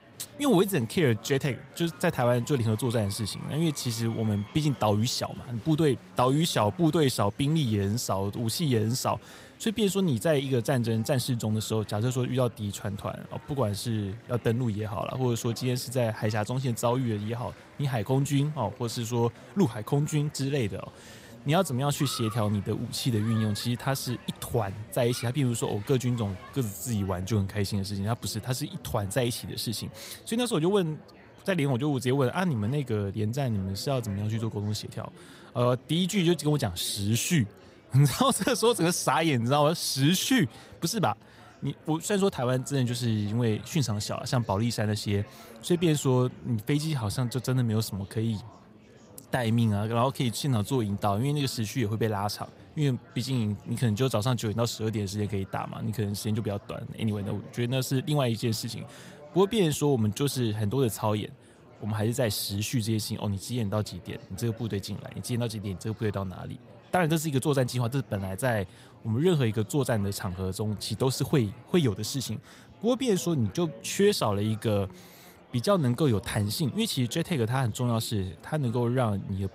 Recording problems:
murmuring crowd; faint; throughout; 20 dB below the speech

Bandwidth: 15.5 kHz